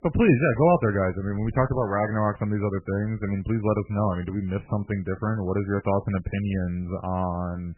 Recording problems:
garbled, watery; badly; nothing above 2.5 kHz

